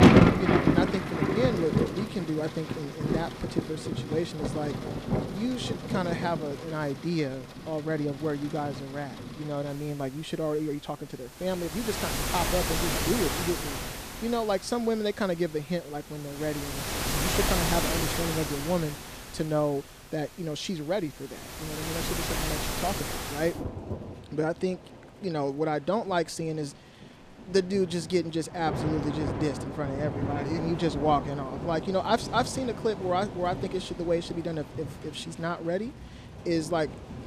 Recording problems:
rain or running water; loud; throughout; as loud as the speech

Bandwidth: 14.5 kHz